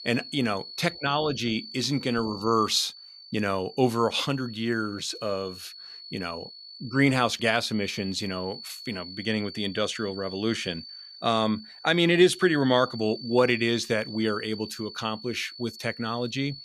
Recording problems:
high-pitched whine; noticeable; throughout; 4.5 kHz, 15 dB below the speech

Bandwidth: 14.5 kHz